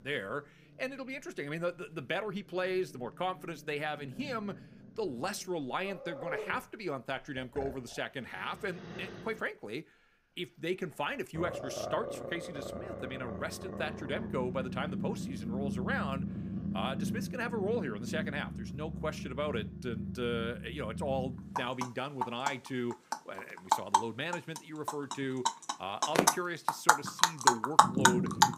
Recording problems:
animal sounds; very loud; throughout; 4 dB above the speech

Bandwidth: 15 kHz